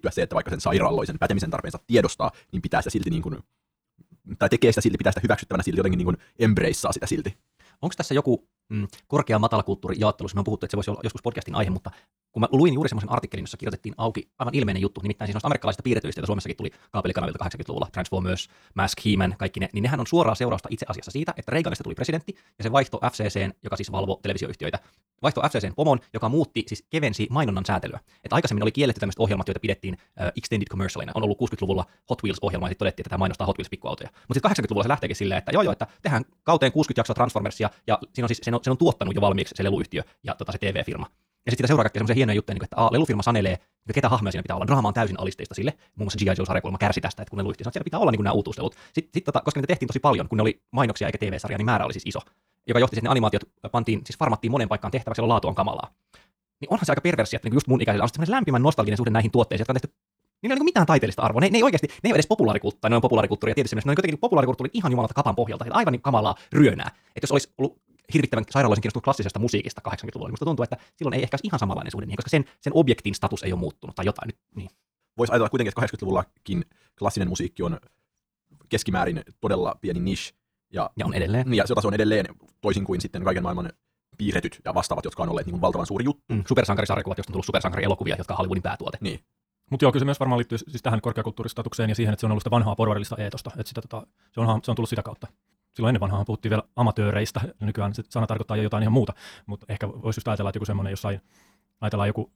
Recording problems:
wrong speed, natural pitch; too fast; 1.6 times normal speed

